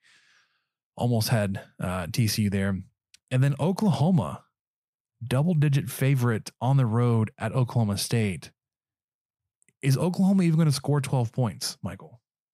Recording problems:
none

